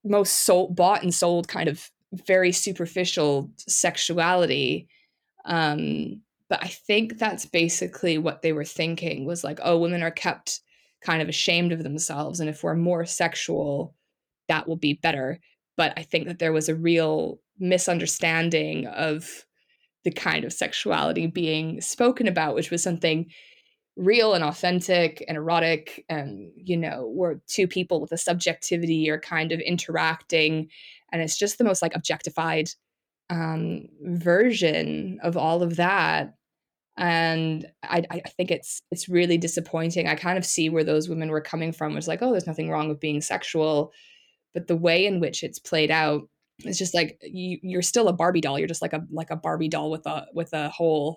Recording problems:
uneven, jittery; strongly; from 1 to 49 s

